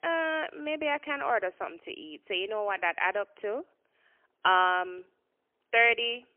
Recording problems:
phone-call audio; poor line; nothing above 3 kHz

